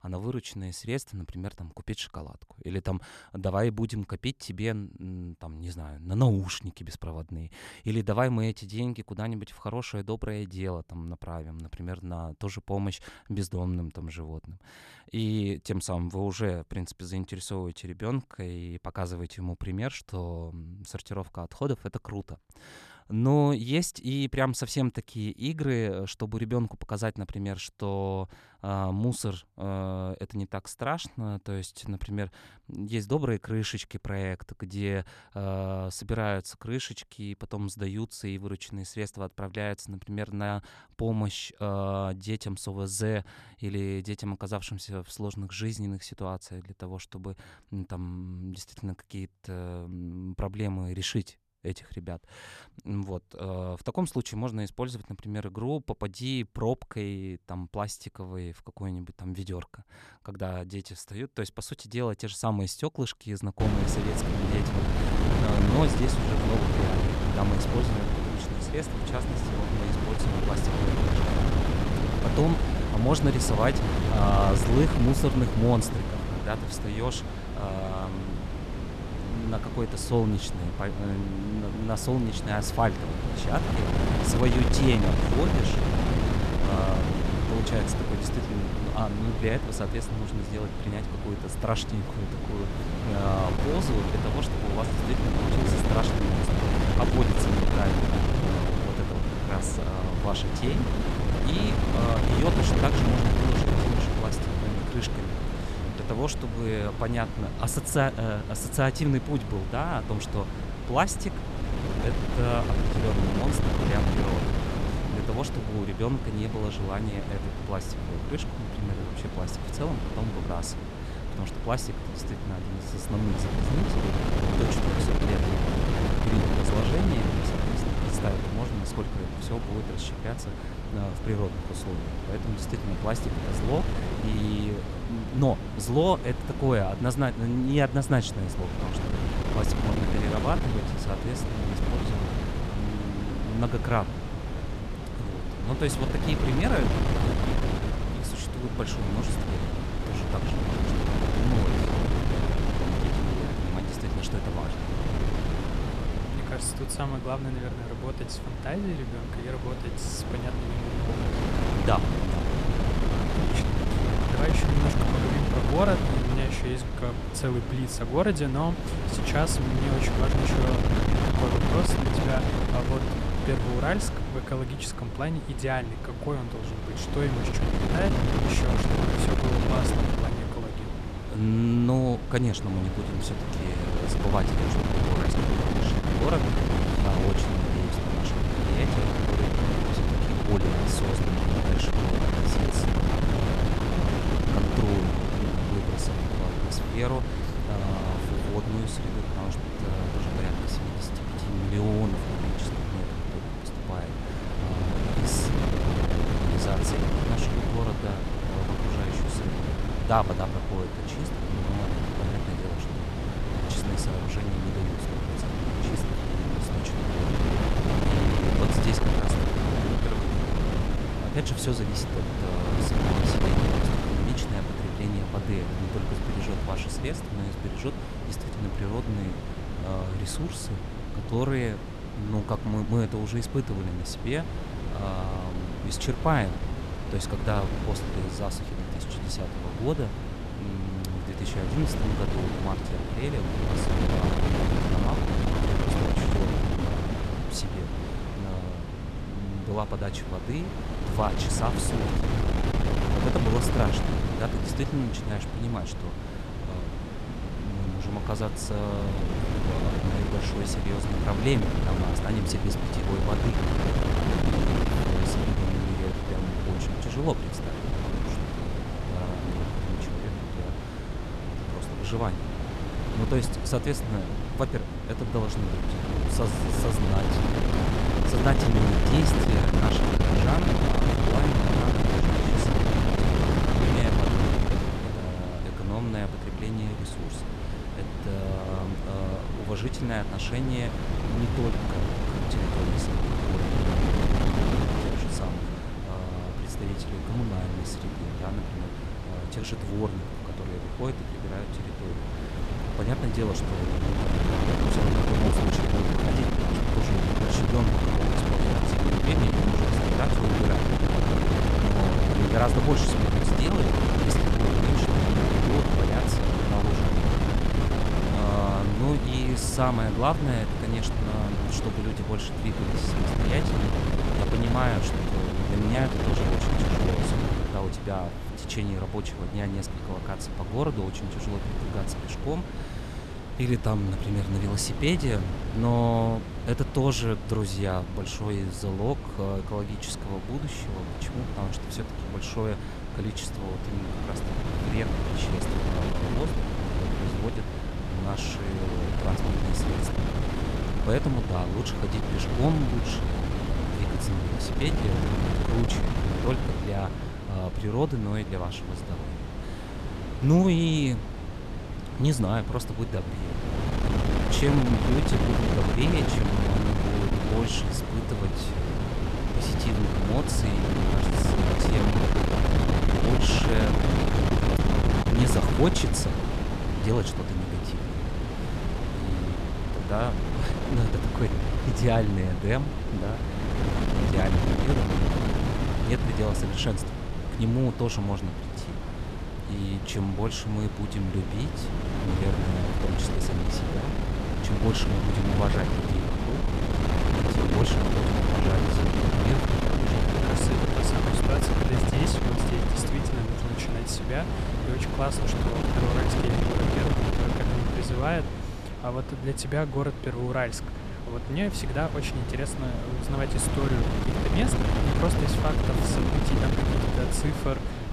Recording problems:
wind noise on the microphone; heavy; from 1:04 on; 1 dB above the speech

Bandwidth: 13.5 kHz